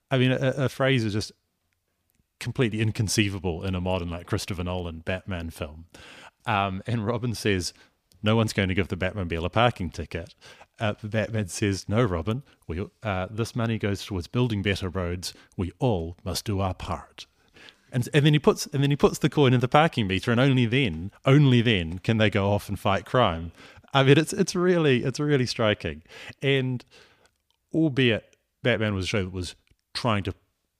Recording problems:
none

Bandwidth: 15 kHz